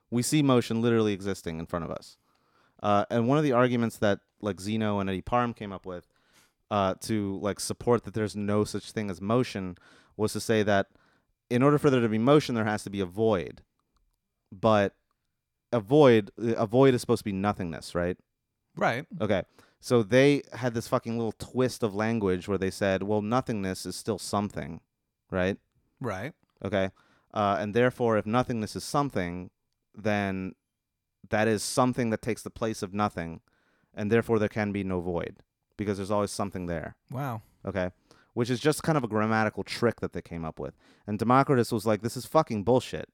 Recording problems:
none

